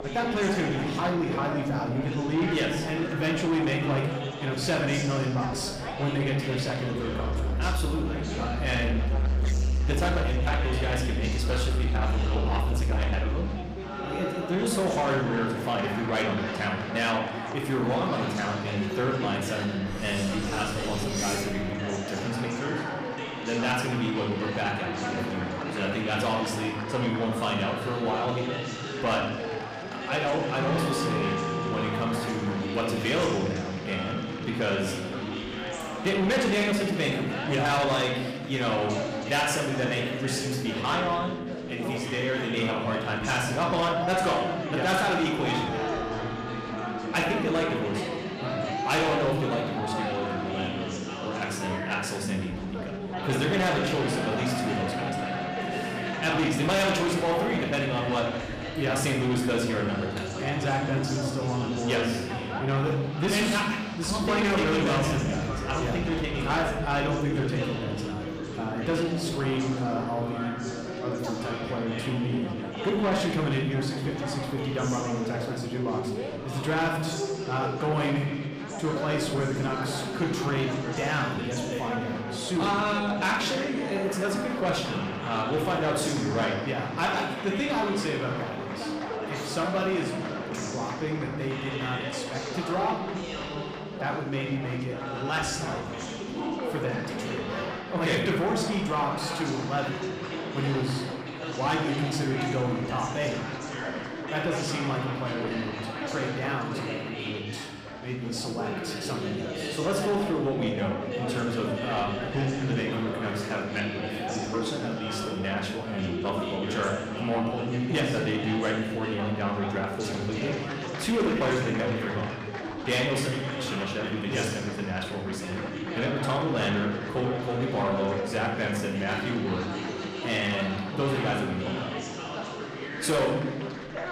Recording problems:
room echo; noticeable; dies away in 0.9 s
distortion; slight; 10 dB below the speech
off-mic speech; somewhat distant
background music; loud; until 1:07; 6 dB below the speech
chatter from many people; loud; throughout; 5 dB below the speech
clattering dishes; noticeable; from 20 to 22 s; peak 2 dB below the speech

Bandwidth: 15 kHz